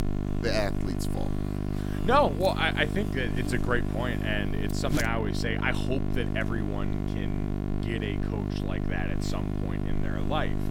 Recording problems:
electrical hum; loud; throughout; 50 Hz, 8 dB below the speech

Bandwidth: 16 kHz